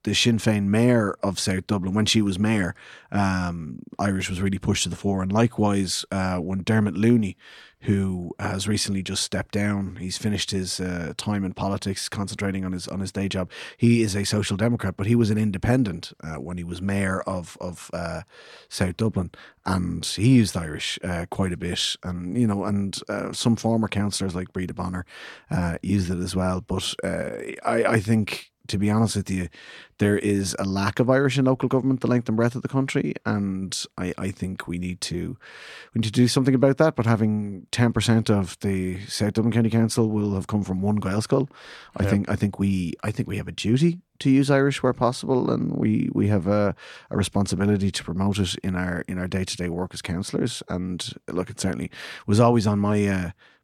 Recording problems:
none

